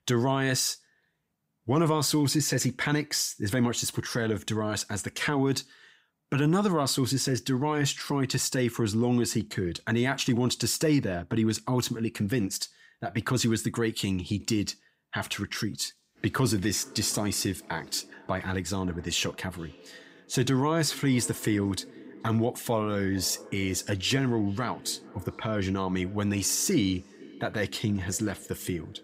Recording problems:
echo of what is said; faint; from 16 s on; 430 ms later, 20 dB below the speech

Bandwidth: 15.5 kHz